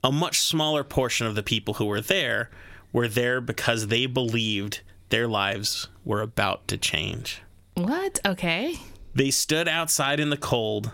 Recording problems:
squashed, flat; somewhat

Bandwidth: 16 kHz